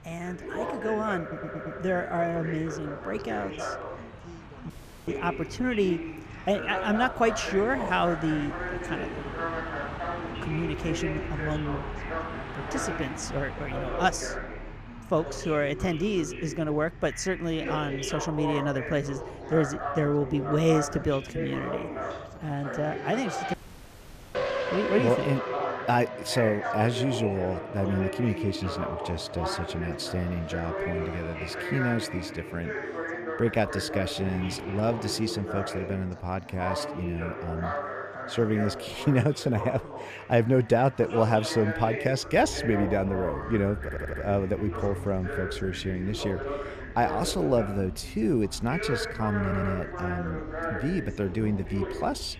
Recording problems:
background chatter; loud; throughout; 2 voices, 7 dB below the speech
traffic noise; noticeable; throughout; 10 dB below the speech
audio stuttering; at 1 s, at 44 s and at 49 s
audio cutting out; at 4.5 s and at 24 s for 1 s

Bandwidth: 14.5 kHz